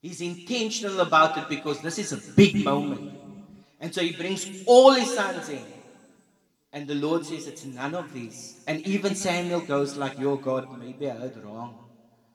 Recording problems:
room echo; slight; dies away in 1.5 s
off-mic speech; somewhat distant

